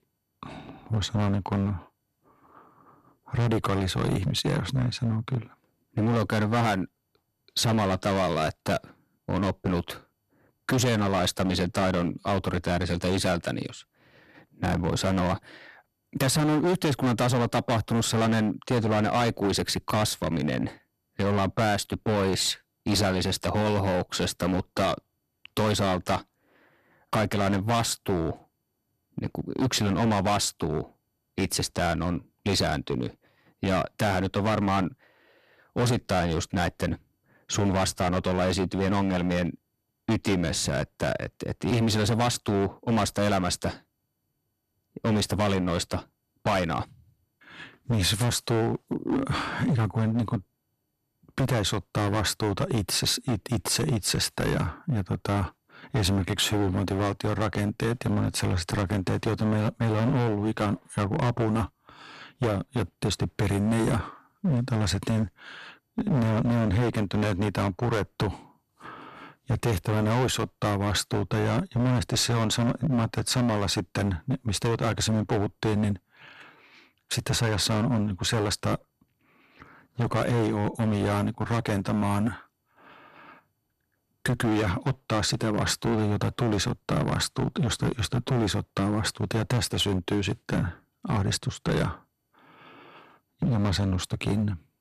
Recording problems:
distortion; heavy; 13% of the sound clipped

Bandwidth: 13.5 kHz